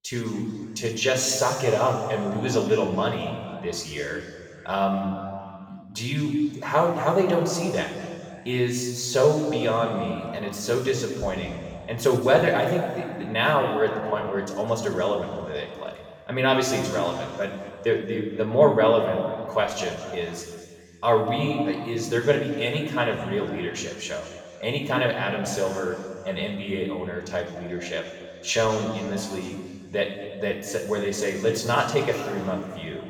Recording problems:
off-mic speech; far
room echo; noticeable; dies away in 2.1 s

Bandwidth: 18.5 kHz